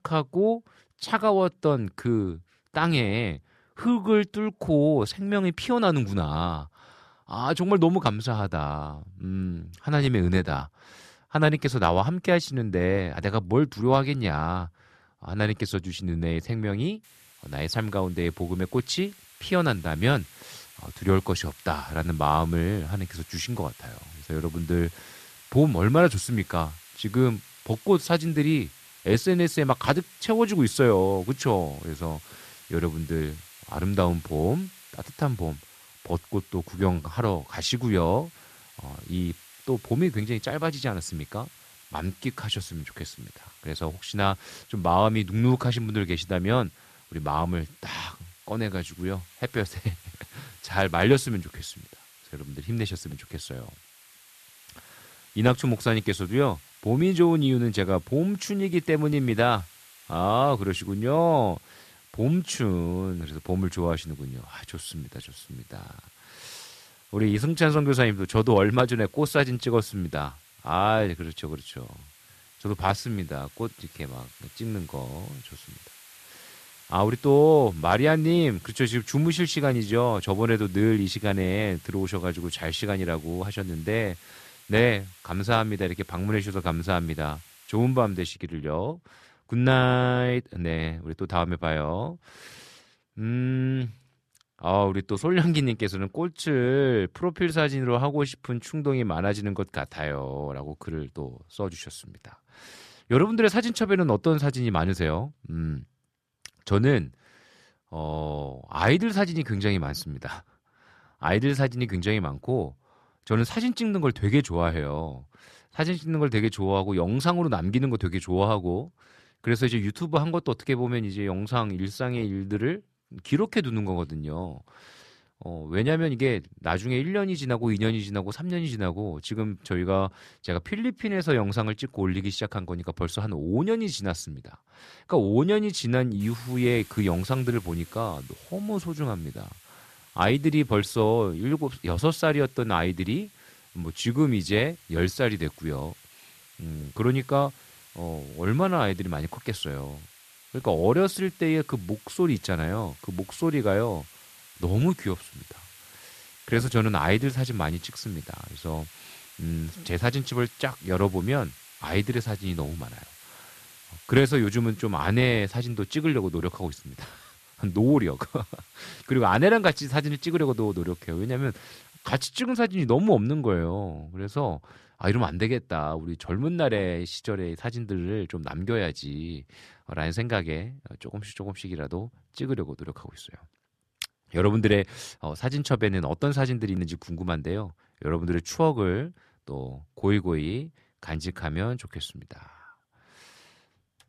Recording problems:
hiss; faint; from 17 s to 1:28 and from 2:16 to 2:52; 25 dB below the speech

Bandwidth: 14 kHz